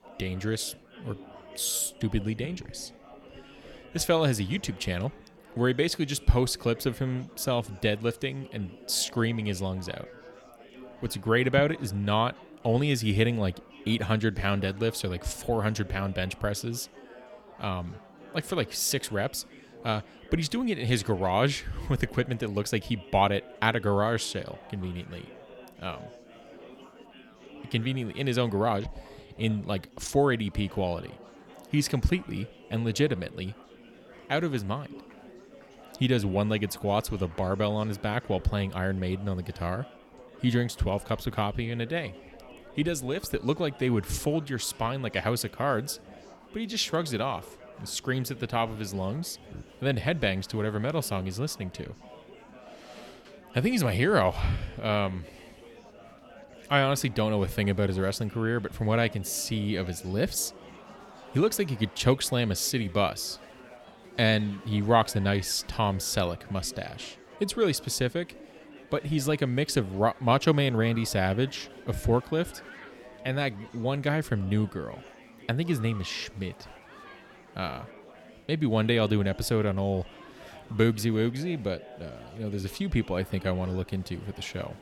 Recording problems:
chatter from many people; faint; throughout; 20 dB below the speech

